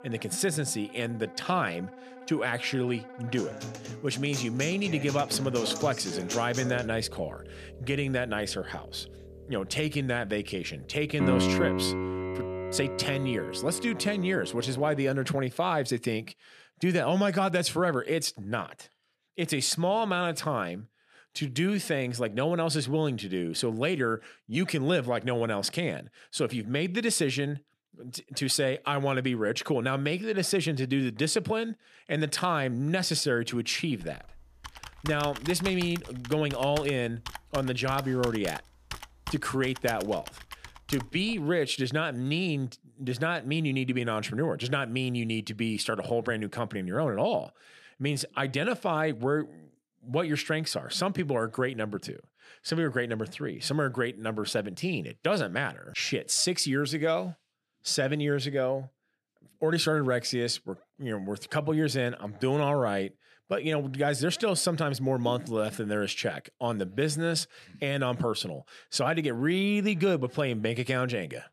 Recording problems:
background music; loud; until 15 s; 6 dB below the speech
keyboard typing; noticeable; from 34 to 41 s; peak 9 dB below the speech

